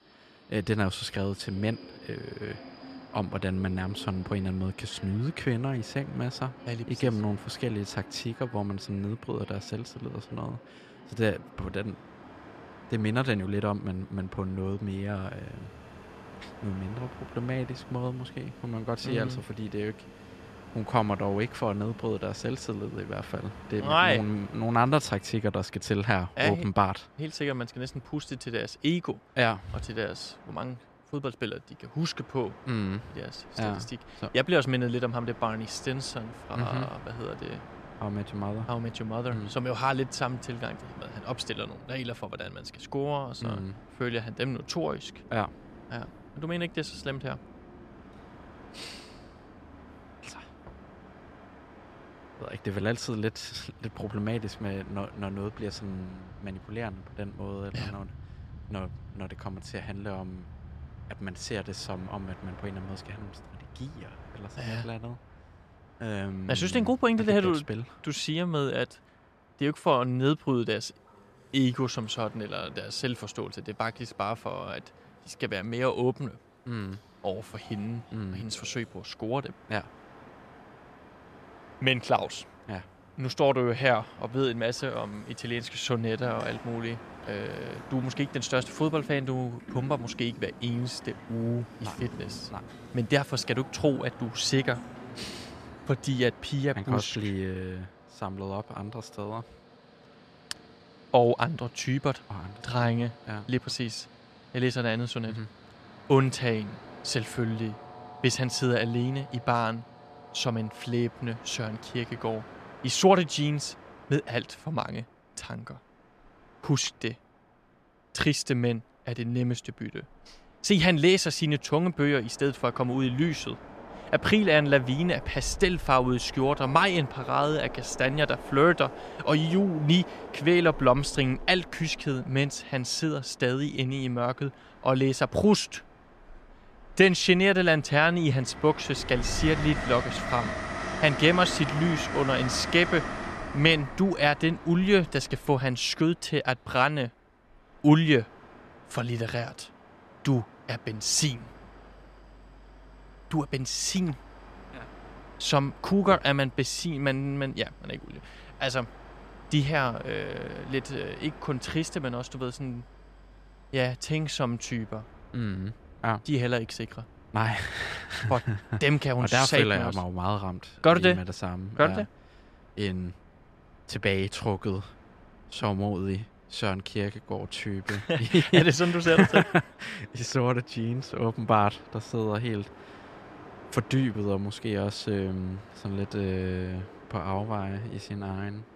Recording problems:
train or aircraft noise; noticeable; throughout; 15 dB below the speech

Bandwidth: 14 kHz